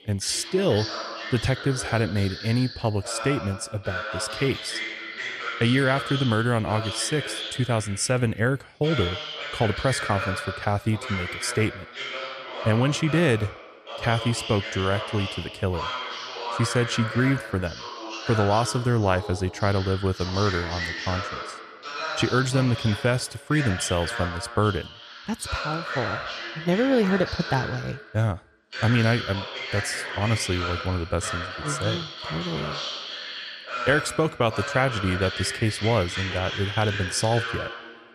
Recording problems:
voice in the background; loud; throughout; 6 dB below the speech

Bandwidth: 14 kHz